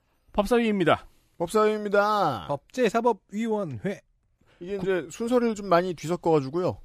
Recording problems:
none

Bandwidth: 15 kHz